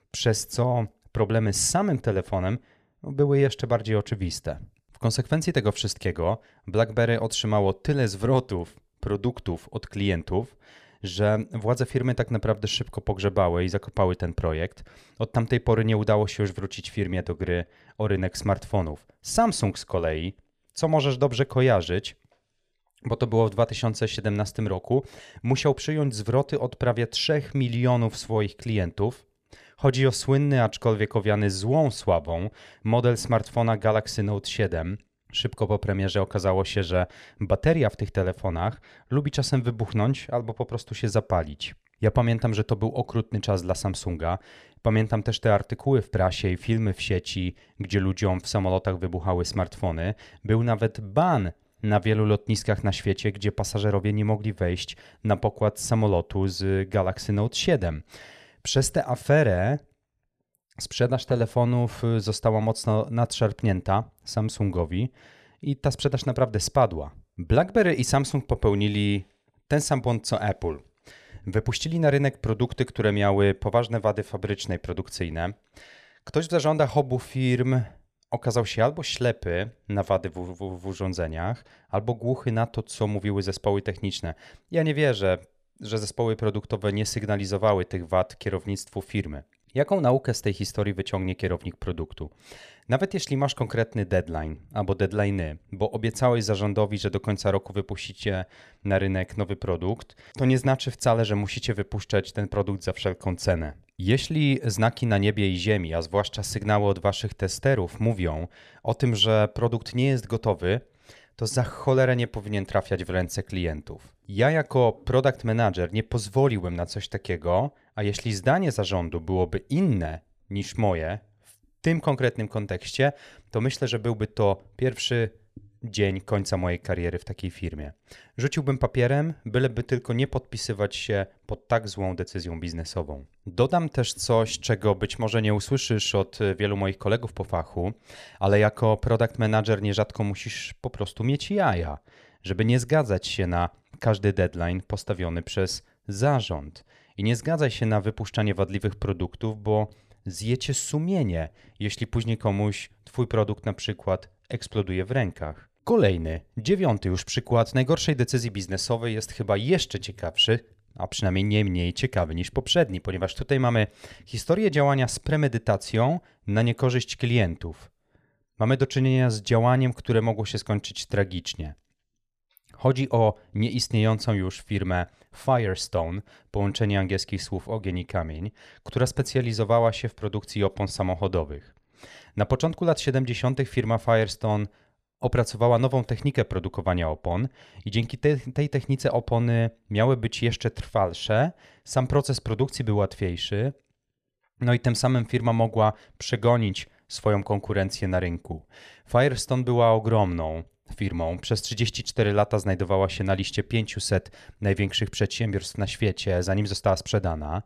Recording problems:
none

